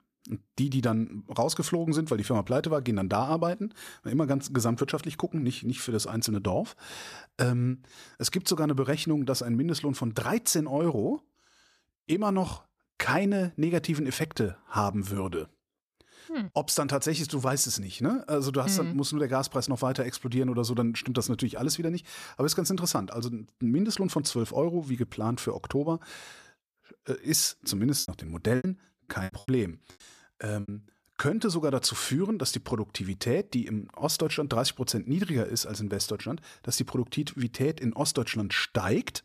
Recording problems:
choppy; very; from 28 to 31 s; 20% of the speech affected

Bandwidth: 14.5 kHz